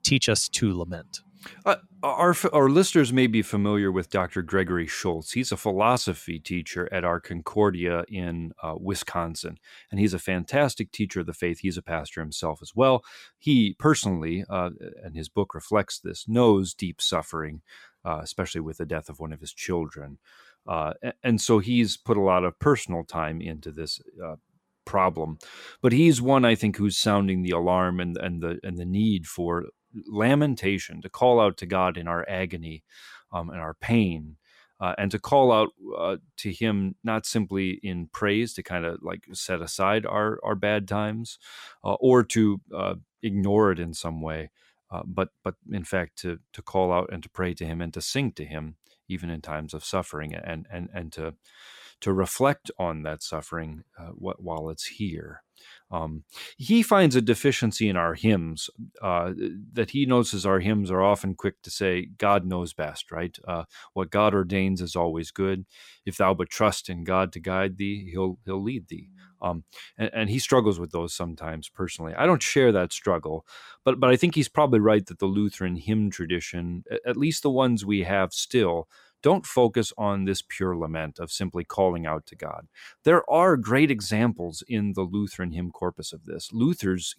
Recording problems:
none

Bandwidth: 16.5 kHz